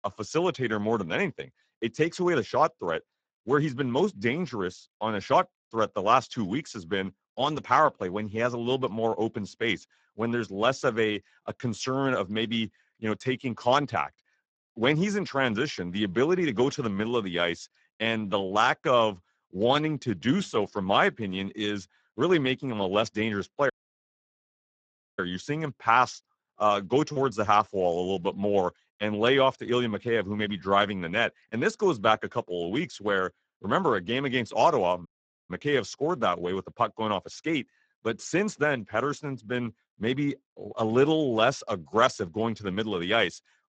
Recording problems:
garbled, watery; badly; nothing above 7.5 kHz
audio cutting out; at 24 s for 1.5 s and at 35 s

